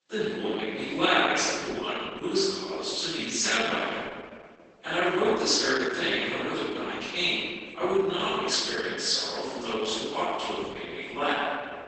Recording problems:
room echo; strong; dies away in 1.8 s
off-mic speech; far
garbled, watery; badly; nothing above 8 kHz
thin; very slightly; fading below 300 Hz

